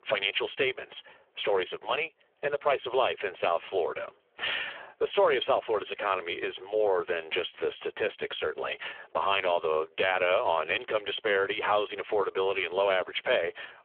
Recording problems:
phone-call audio; poor line; nothing above 3.5 kHz
squashed, flat; heavily

